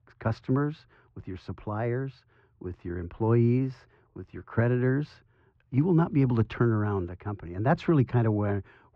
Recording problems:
muffled; very; fading above 1.5 kHz

